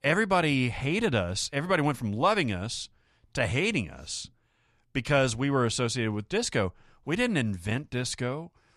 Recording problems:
none

